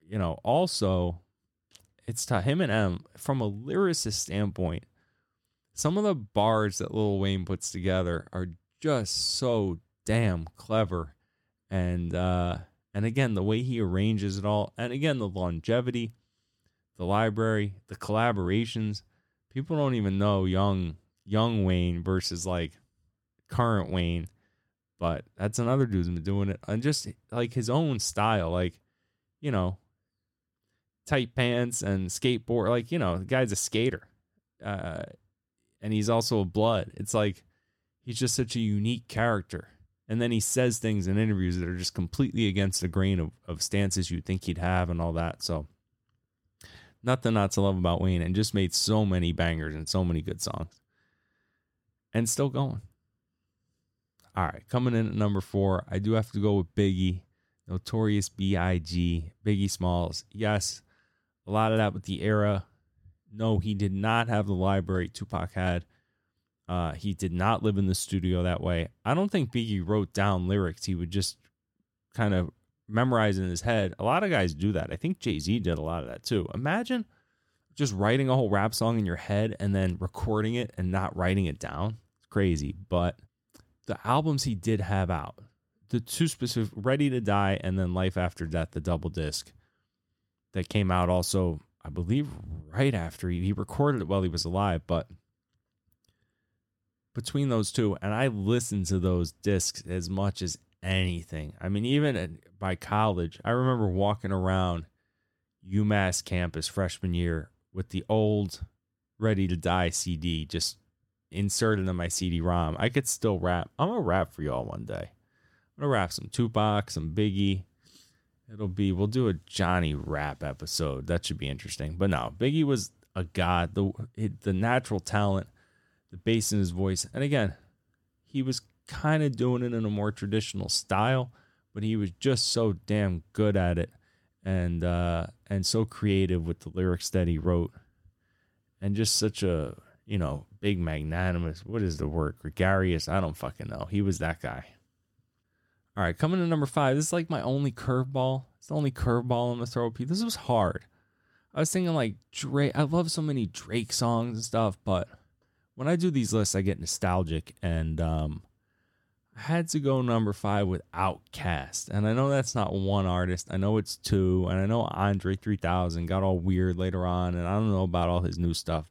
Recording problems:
none

